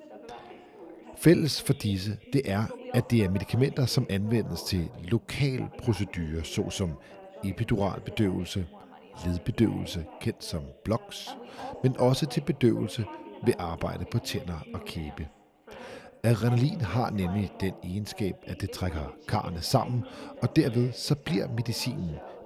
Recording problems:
background chatter; noticeable; throughout; 2 voices, 15 dB below the speech

